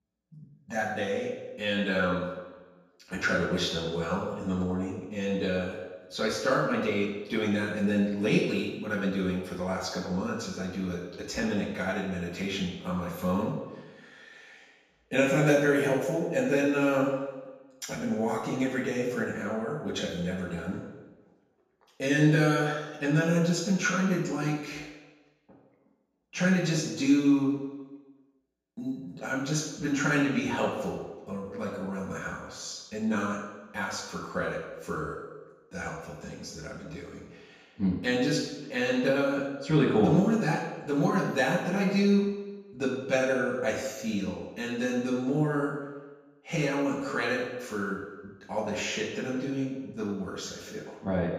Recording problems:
off-mic speech; far
room echo; noticeable; dies away in 1.1 s

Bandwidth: 14.5 kHz